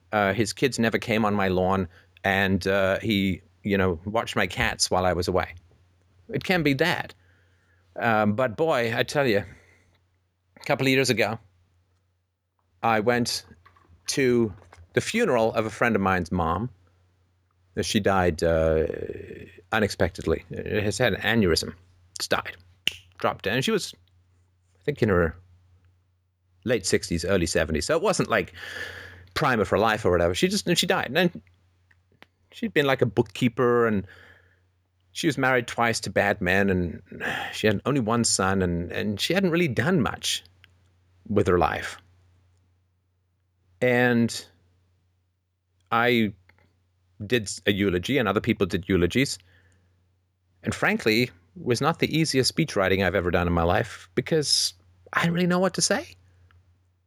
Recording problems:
none

